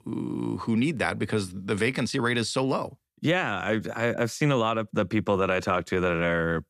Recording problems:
none

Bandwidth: 14.5 kHz